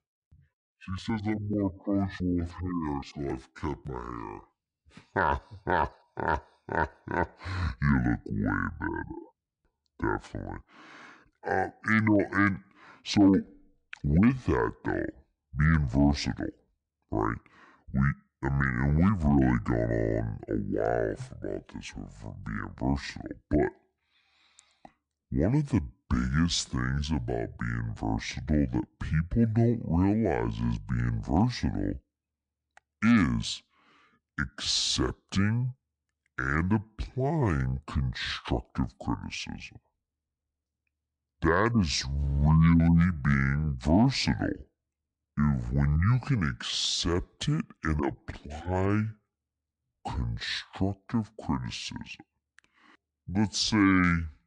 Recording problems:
wrong speed and pitch; too slow and too low; 0.6 times normal speed

